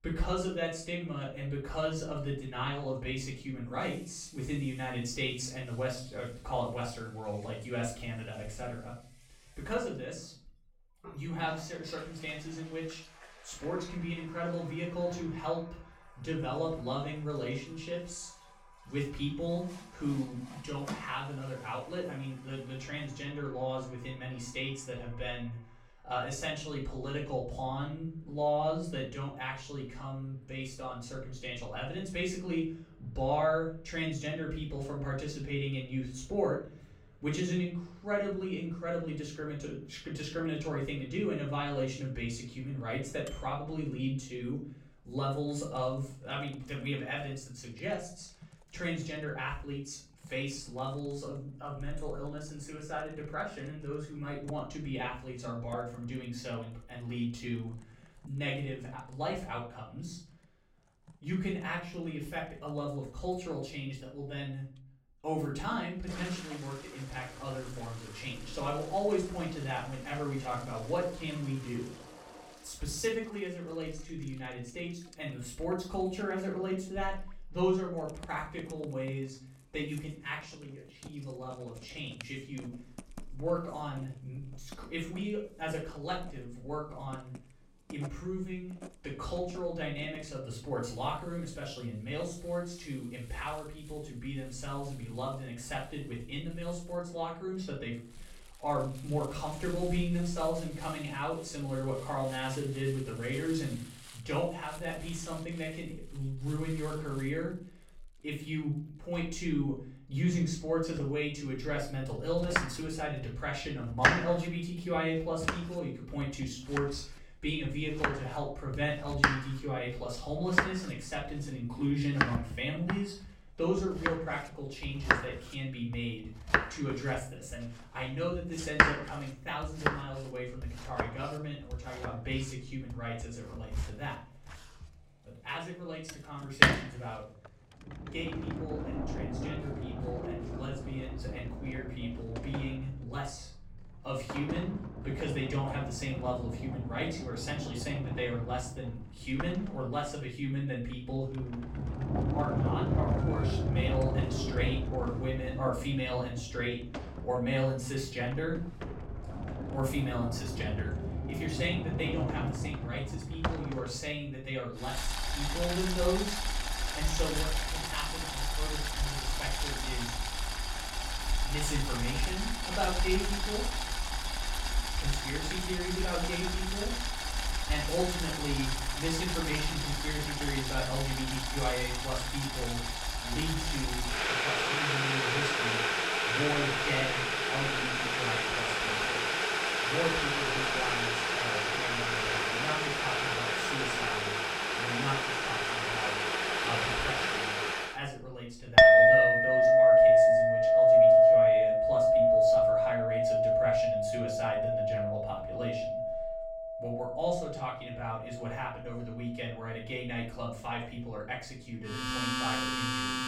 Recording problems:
off-mic speech; far
room echo; slight; dies away in 0.4 s
household noises; very loud; throughout; 7 dB above the speech

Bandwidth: 16.5 kHz